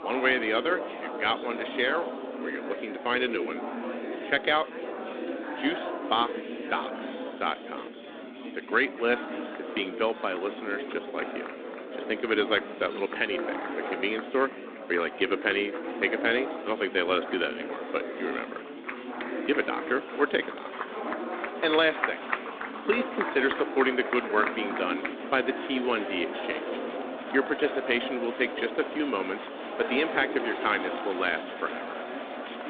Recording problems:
phone-call audio
chatter from many people; loud; throughout; 6 dB below the speech

